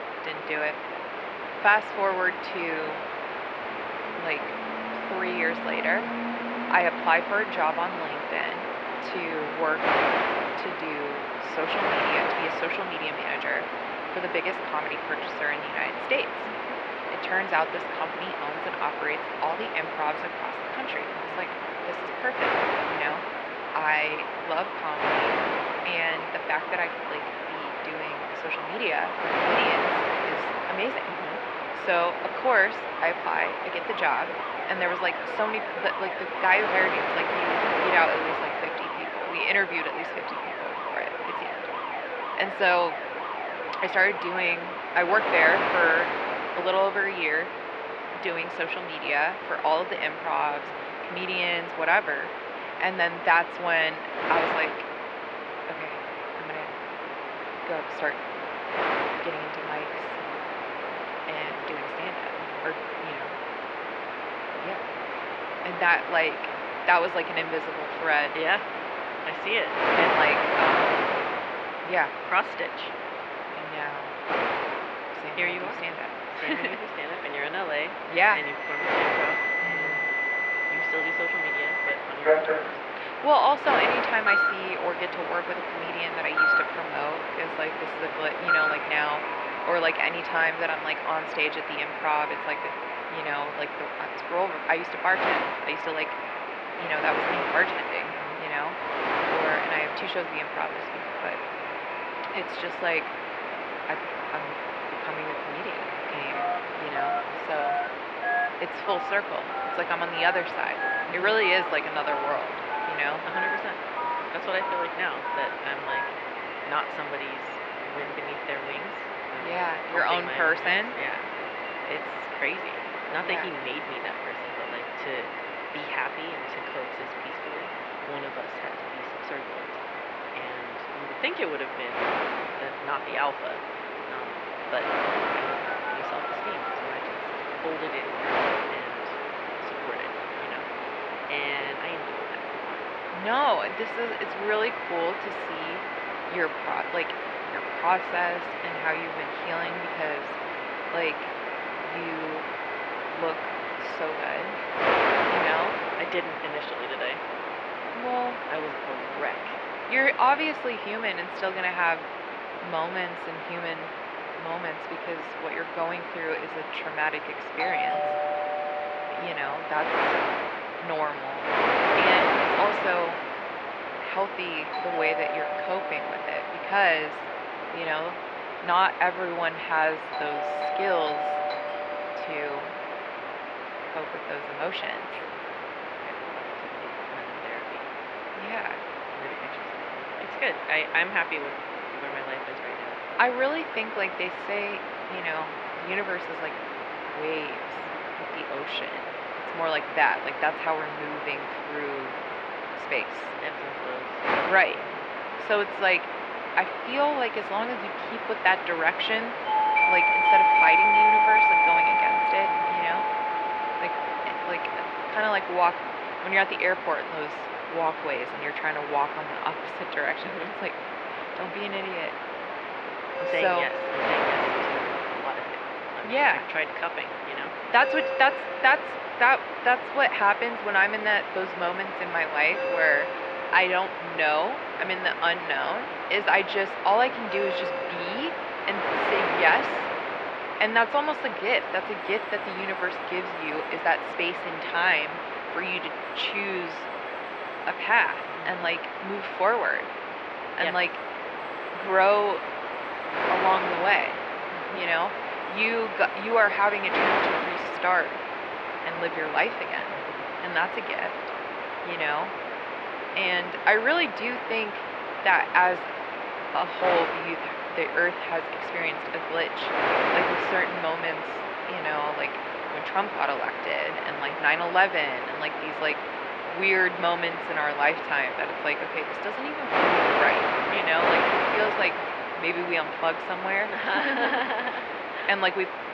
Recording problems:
thin; very; fading below 550 Hz
muffled; slightly; fading above 2.5 kHz
wind noise on the microphone; heavy; 3 dB below the speech
alarms or sirens; loud; throughout; 4 dB below the speech

